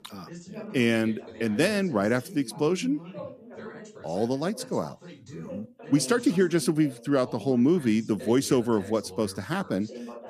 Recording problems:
background chatter; noticeable; throughout; 2 voices, 15 dB below the speech

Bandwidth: 14.5 kHz